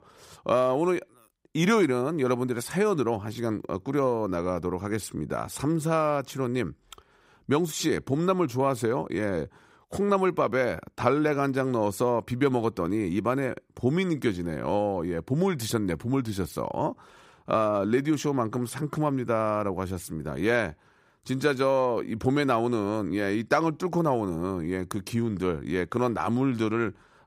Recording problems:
none

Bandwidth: 15.5 kHz